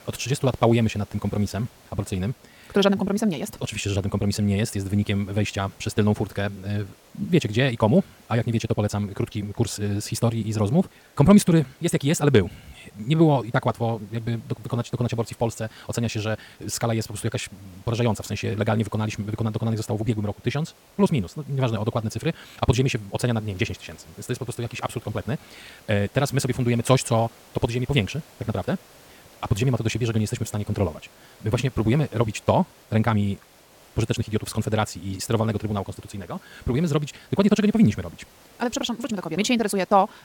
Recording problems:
wrong speed, natural pitch; too fast; 1.8 times normal speed
hiss; faint; throughout; 25 dB below the speech

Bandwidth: 17.5 kHz